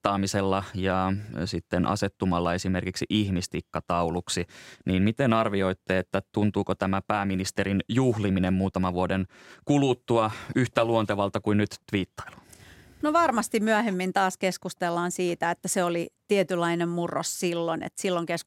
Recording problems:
none

